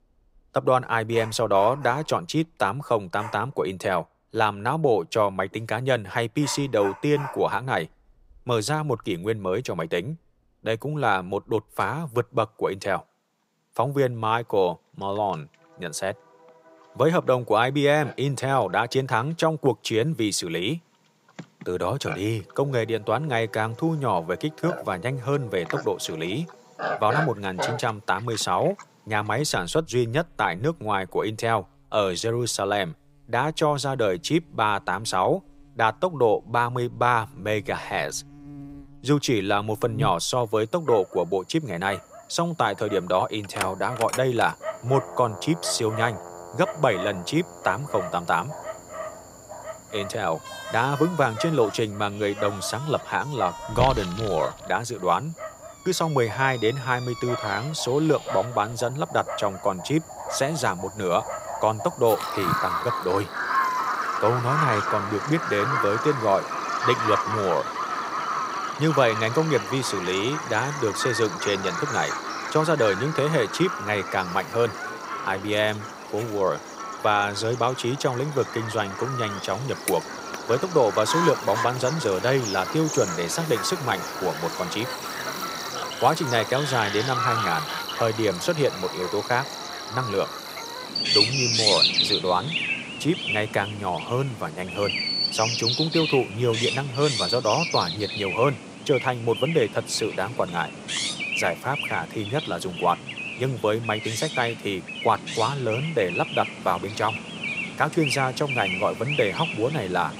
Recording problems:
animal sounds; loud; throughout; 4 dB below the speech

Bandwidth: 15.5 kHz